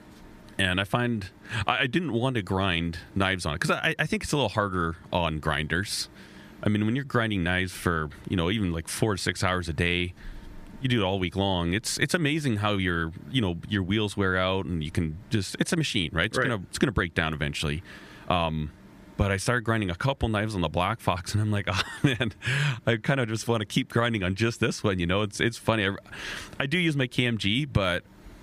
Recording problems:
squashed, flat; somewhat

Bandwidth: 15 kHz